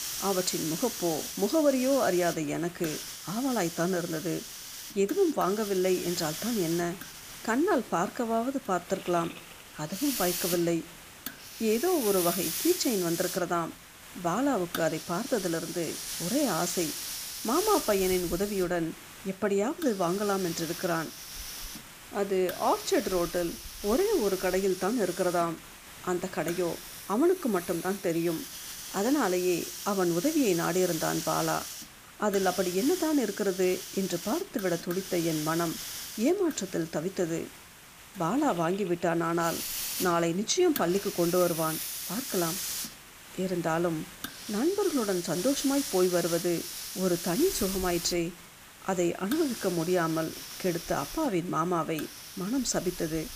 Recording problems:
hiss; loud; throughout; 7 dB below the speech

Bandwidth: 15 kHz